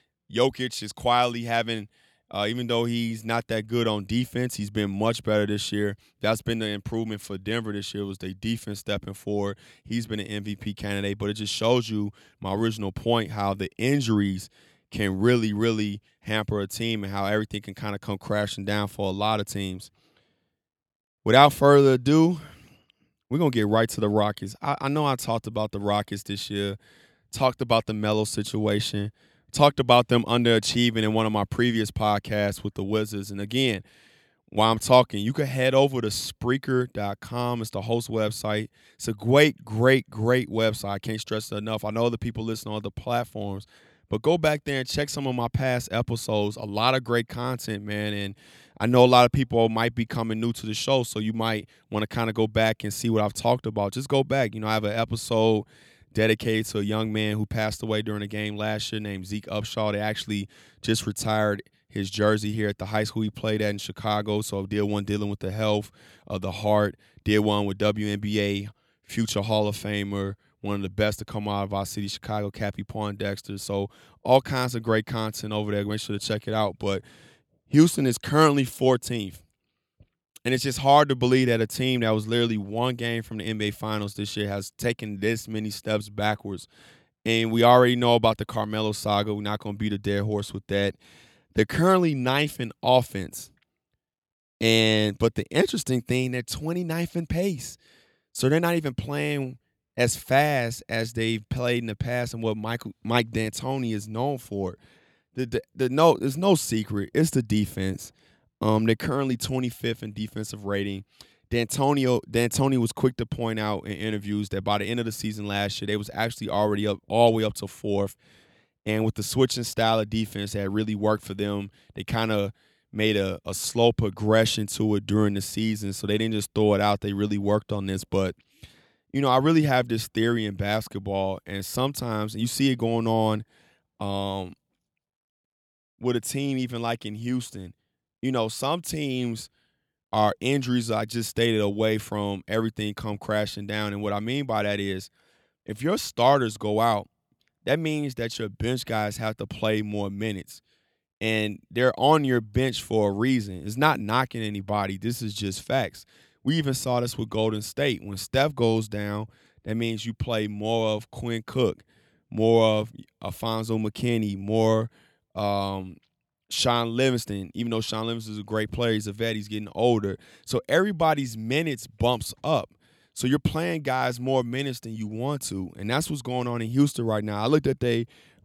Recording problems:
none

